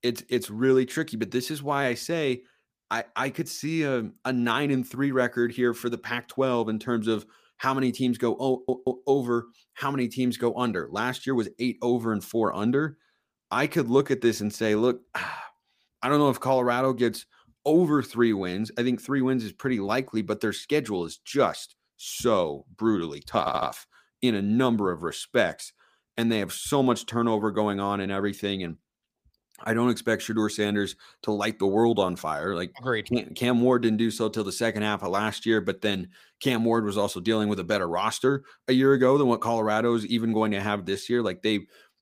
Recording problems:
audio stuttering; at 8.5 s and at 23 s

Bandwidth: 15 kHz